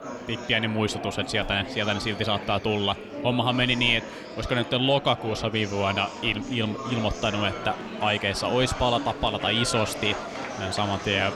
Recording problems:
murmuring crowd; loud; throughout; 9 dB below the speech

